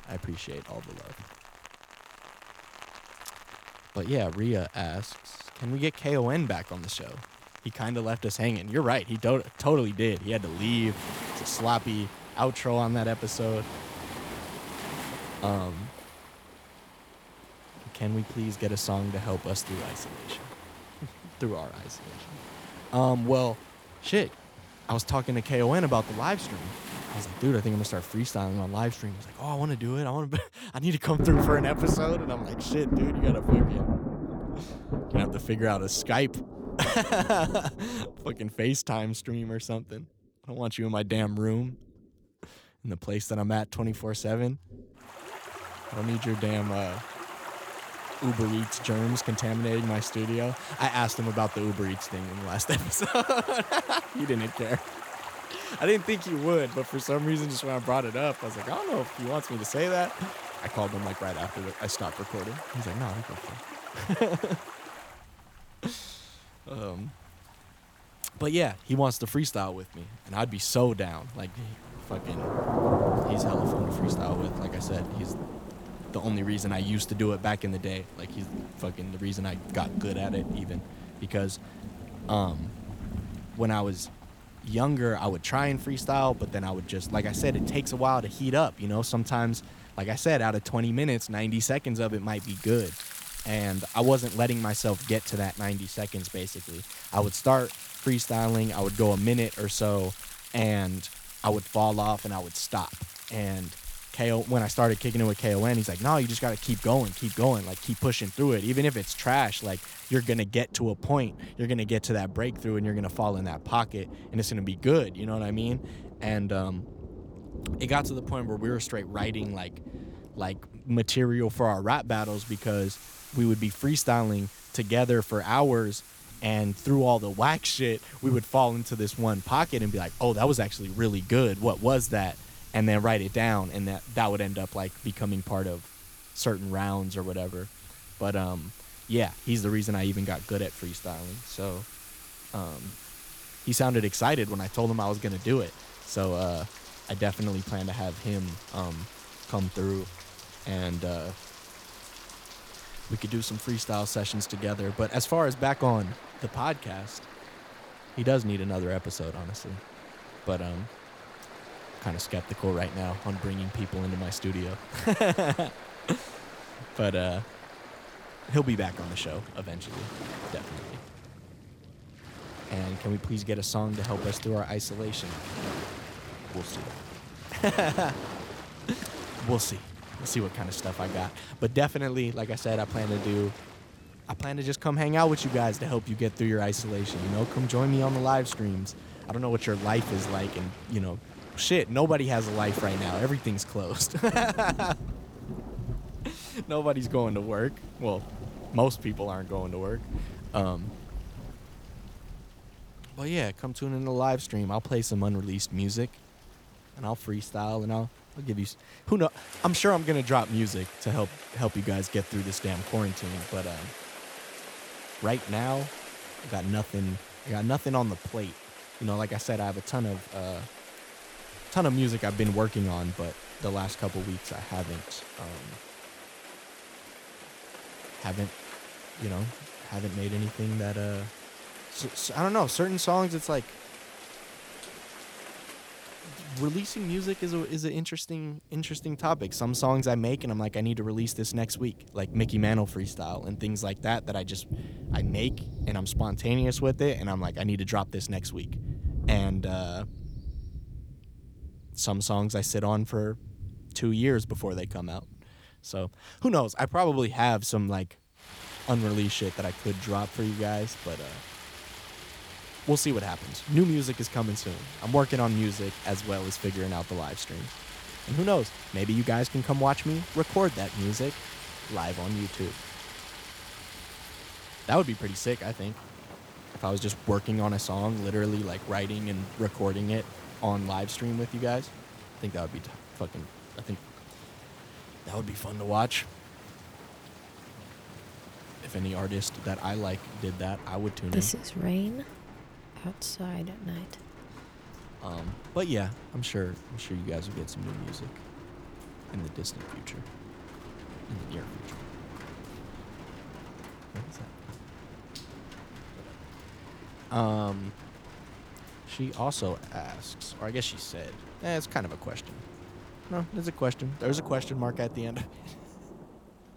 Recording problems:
rain or running water; noticeable; throughout; 10 dB below the speech

